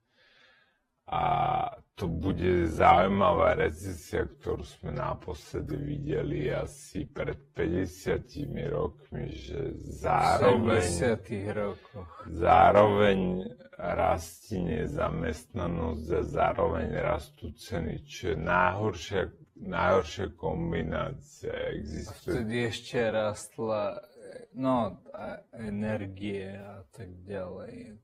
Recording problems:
wrong speed, natural pitch; too slow; 0.5 times normal speed
garbled, watery; slightly; nothing above 15.5 kHz

